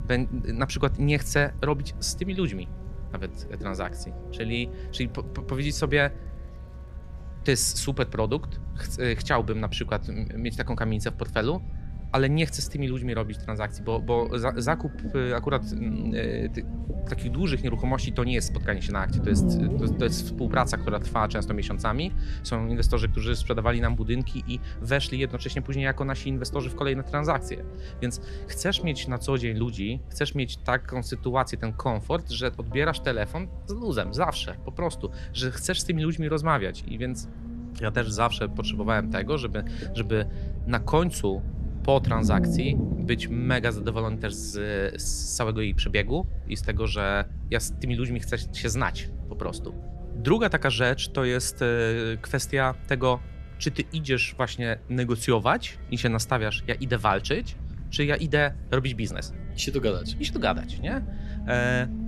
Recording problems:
low rumble; noticeable; throughout; 15 dB below the speech
background music; faint; throughout; 30 dB below the speech
murmuring crowd; faint; throughout; 30 dB below the speech

